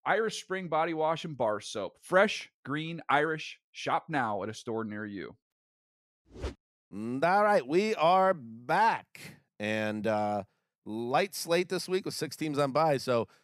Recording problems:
none

